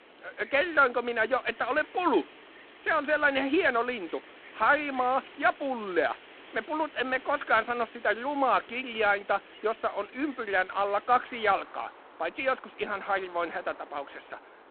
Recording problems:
phone-call audio; poor line; nothing above 4 kHz
wind in the background; faint; throughout; 20 dB below the speech

